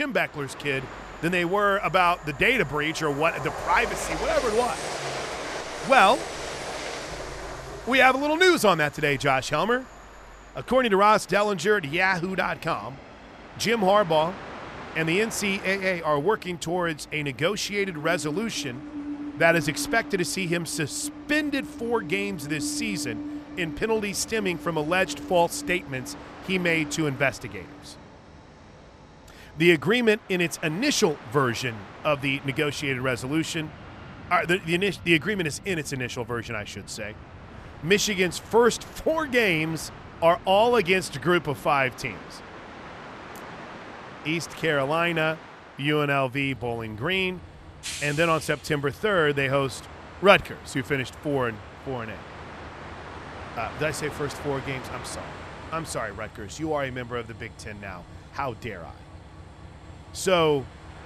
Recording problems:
train or aircraft noise; noticeable; throughout; 15 dB below the speech
abrupt cut into speech; at the start

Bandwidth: 14.5 kHz